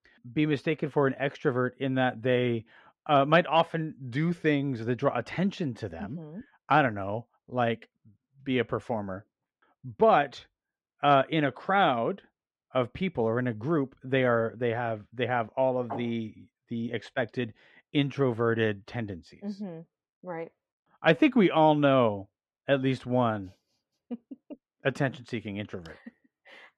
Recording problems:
muffled; slightly; fading above 2.5 kHz

